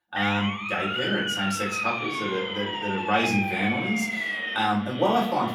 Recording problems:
off-mic speech; far
echo of what is said; noticeable; throughout; 590 ms later, 15 dB below the speech
room echo; slight; dies away in 0.5 s
siren; loud; until 4.5 s; peak 1 dB above the speech

